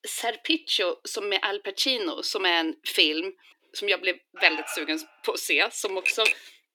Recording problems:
thin; somewhat; fading below 300 Hz
alarm; noticeable; at 4.5 s; peak 7 dB below the speech
keyboard typing; loud; at 6 s; peak 2 dB above the speech

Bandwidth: 19 kHz